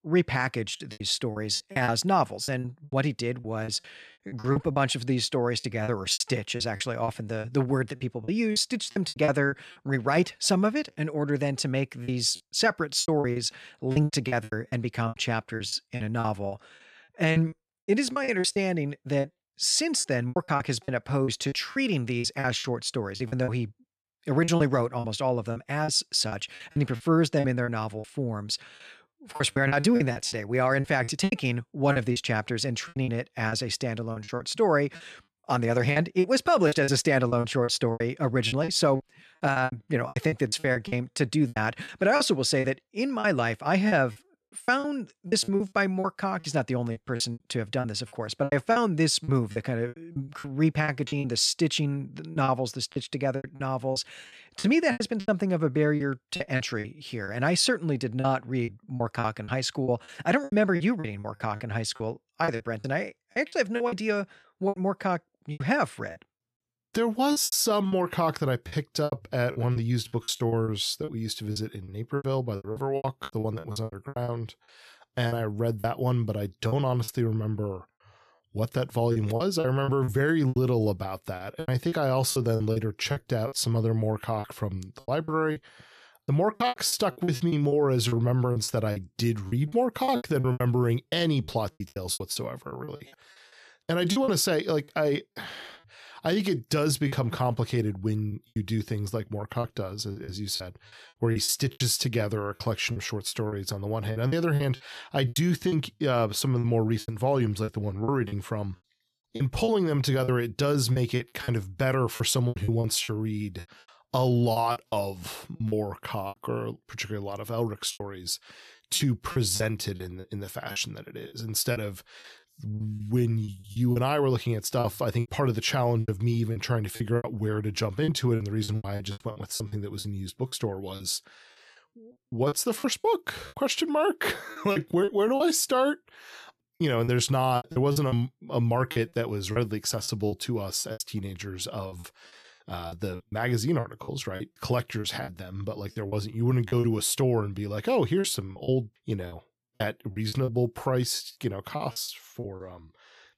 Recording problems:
choppy; very; 13% of the speech affected

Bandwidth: 14 kHz